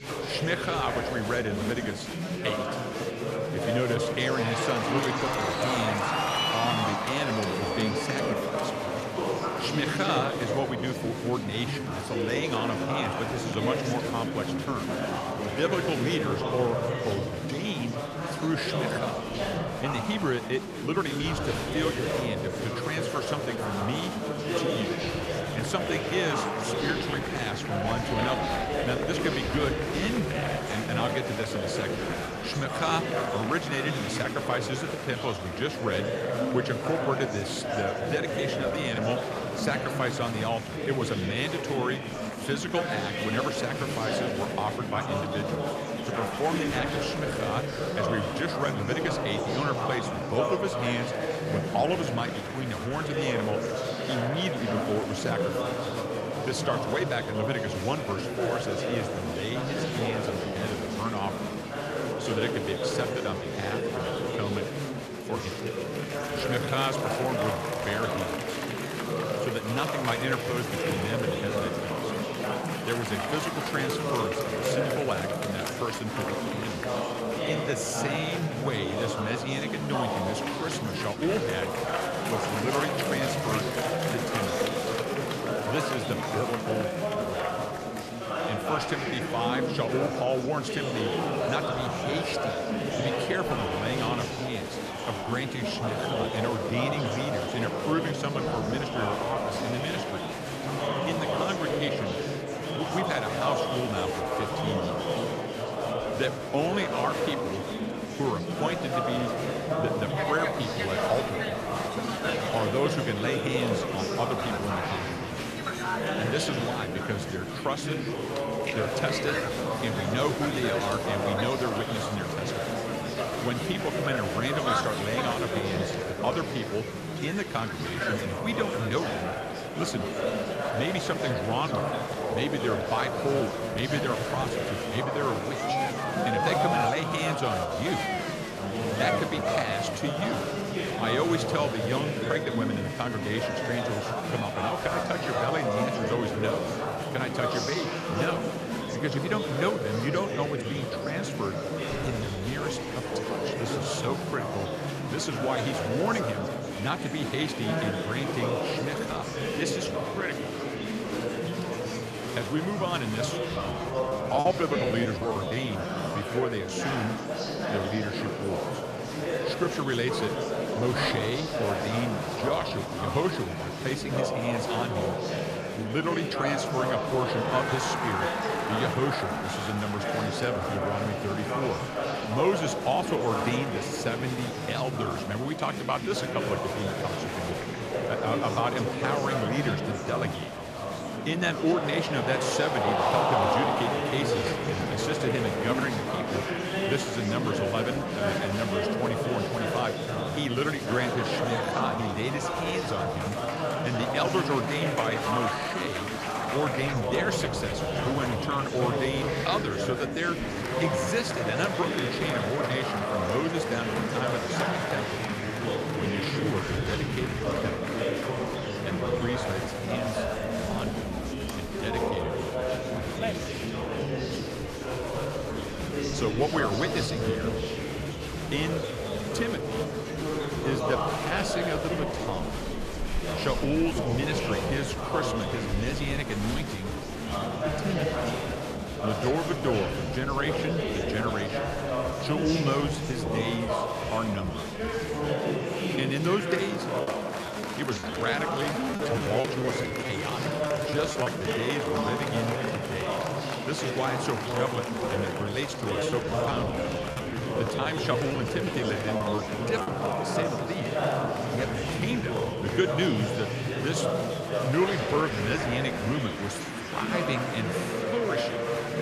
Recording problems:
murmuring crowd; very loud; throughout; 2 dB above the speech
choppy; very; from 2:44 to 2:46, from 4:08 to 4:11 and from 4:16 to 4:20; 13% of the speech affected

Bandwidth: 14 kHz